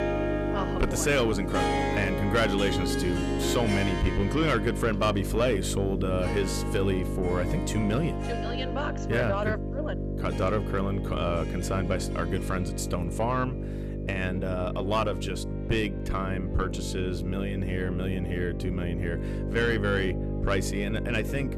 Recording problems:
distortion; slight; 10 dB below the speech
electrical hum; loud; throughout; 50 Hz, 9 dB below the speech
background music; loud; throughout; 6 dB below the speech

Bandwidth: 14 kHz